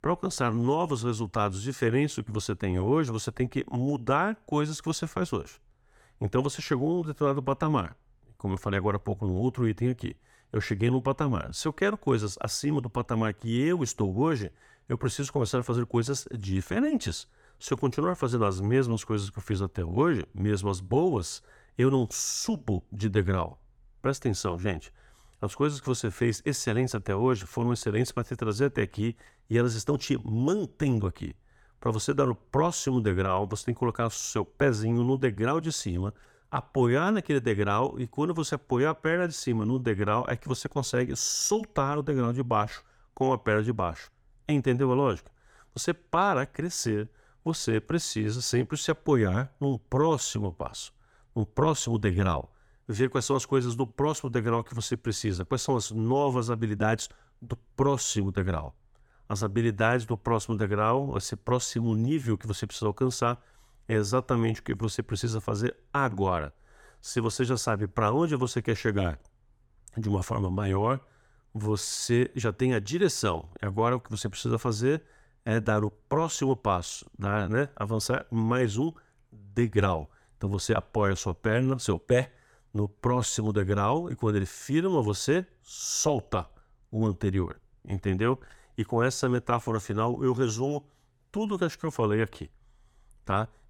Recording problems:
none

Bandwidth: 18 kHz